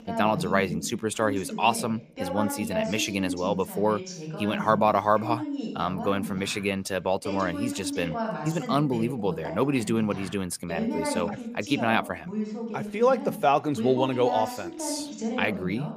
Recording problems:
voice in the background; loud; throughout; 6 dB below the speech

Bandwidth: 15 kHz